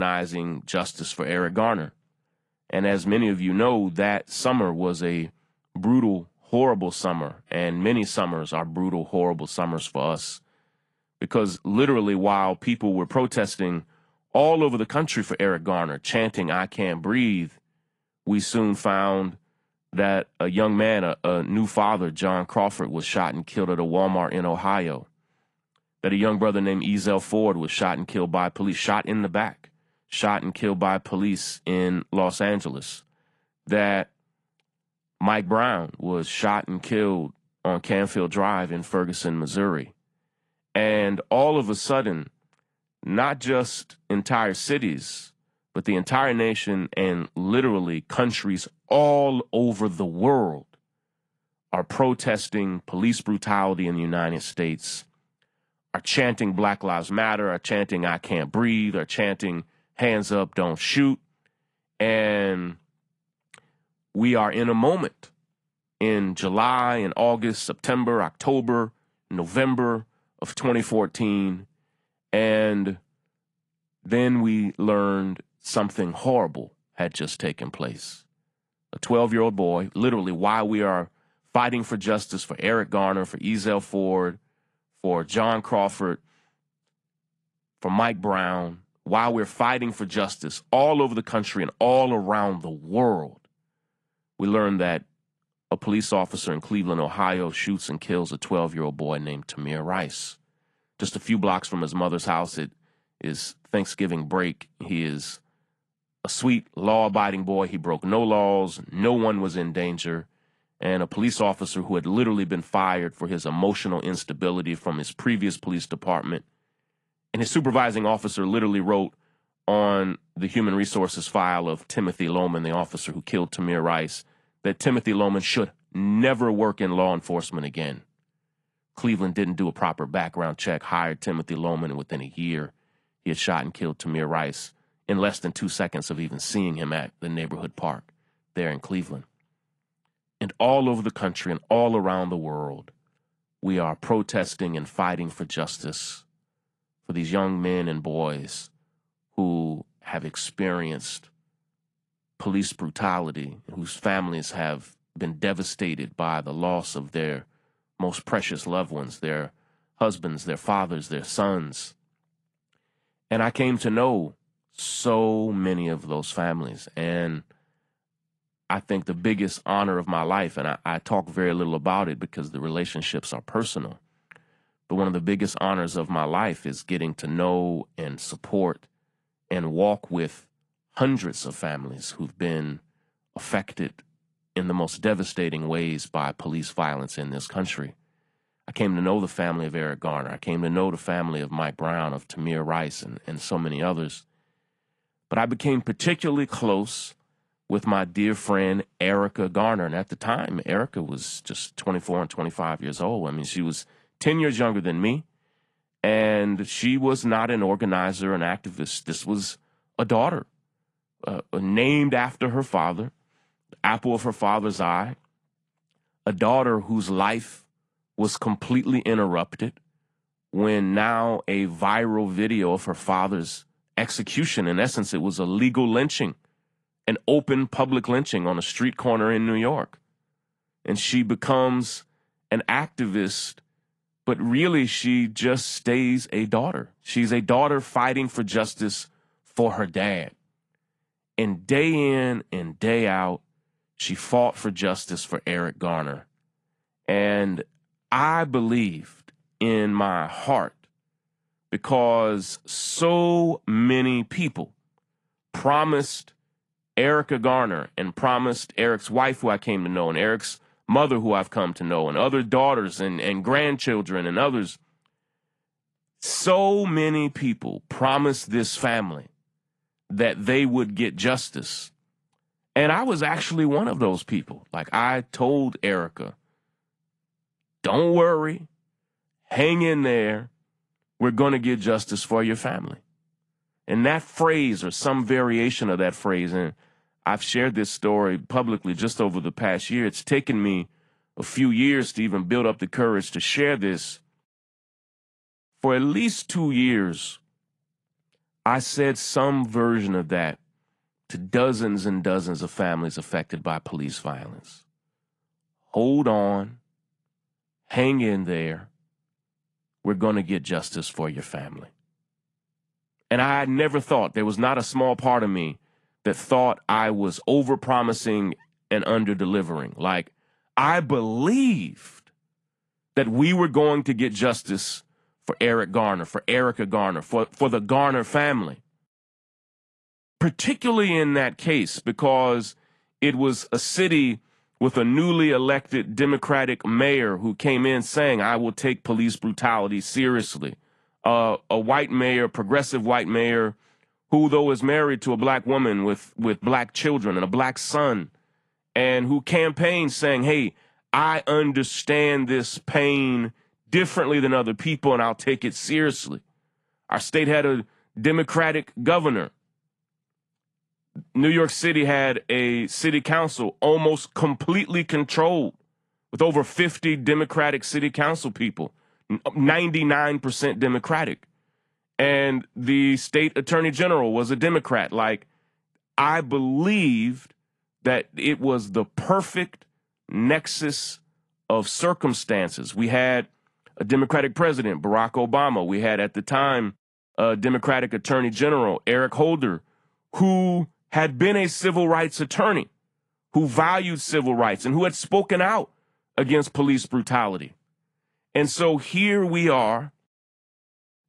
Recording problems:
garbled, watery; slightly
abrupt cut into speech; at the start

